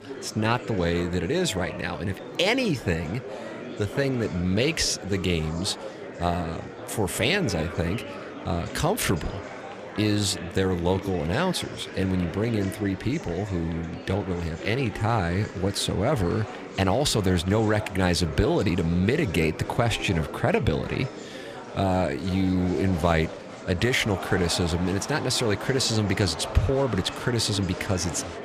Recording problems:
murmuring crowd; noticeable; throughout; 10 dB below the speech

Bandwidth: 15 kHz